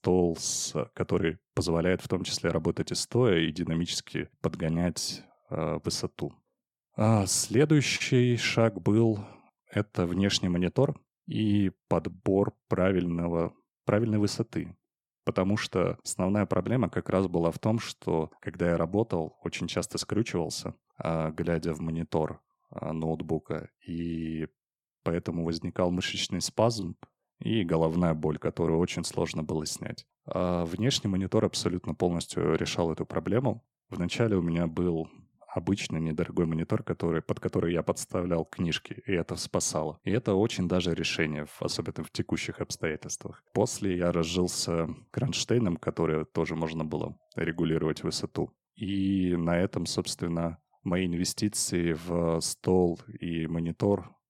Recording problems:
none

